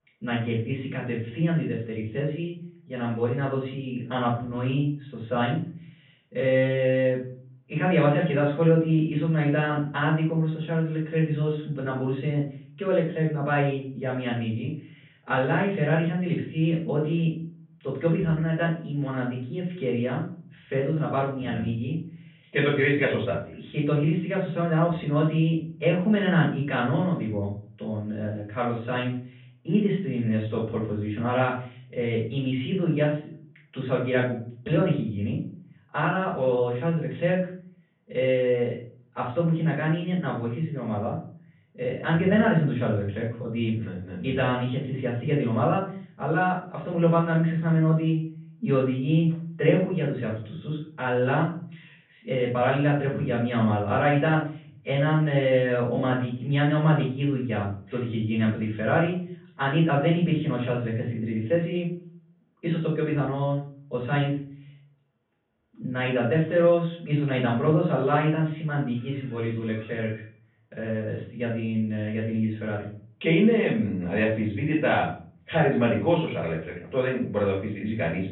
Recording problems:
off-mic speech; far
high frequencies cut off; severe; nothing above 3.5 kHz
room echo; noticeable; dies away in 0.4 s

